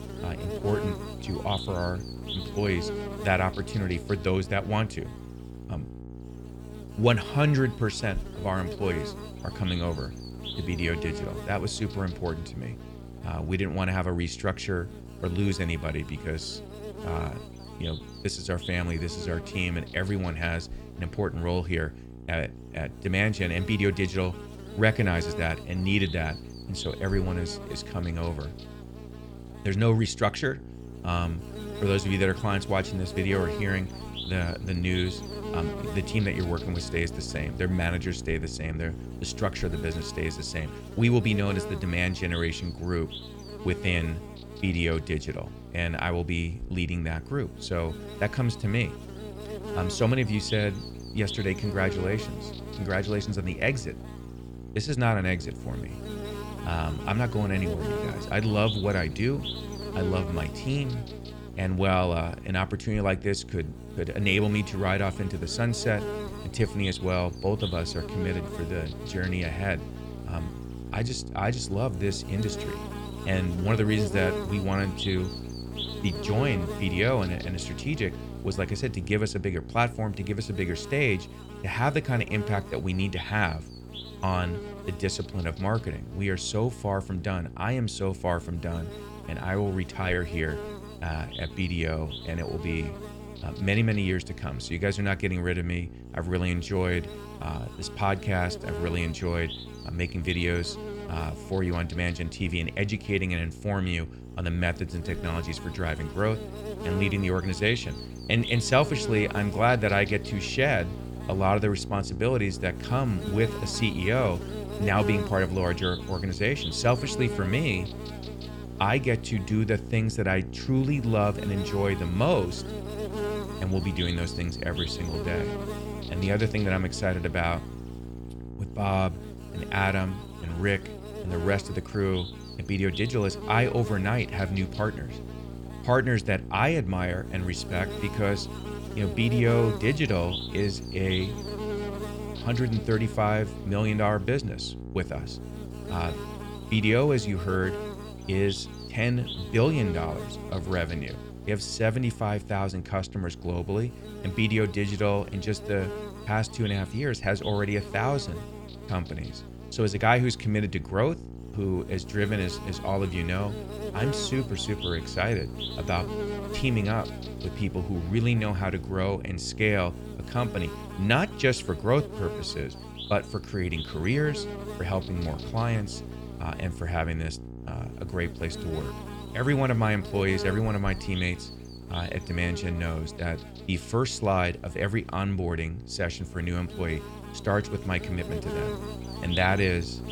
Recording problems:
electrical hum; loud; throughout; 60 Hz, 10 dB below the speech

